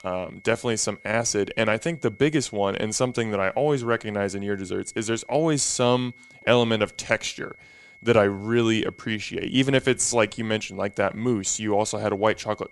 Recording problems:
high-pitched whine; faint; throughout; 2 kHz, 25 dB below the speech

